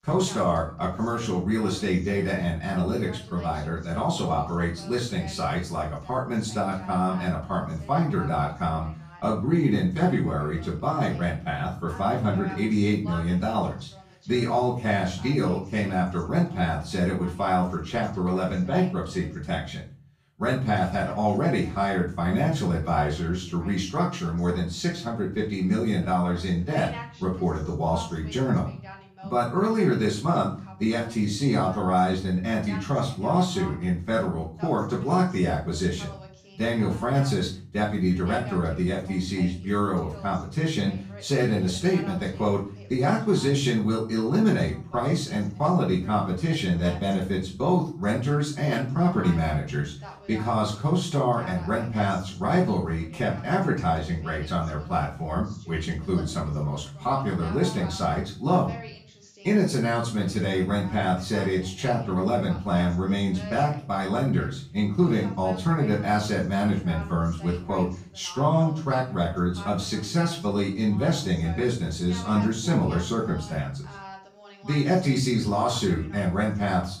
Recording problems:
off-mic speech; far
room echo; slight; dies away in 0.4 s
voice in the background; faint; throughout; 20 dB below the speech

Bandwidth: 15 kHz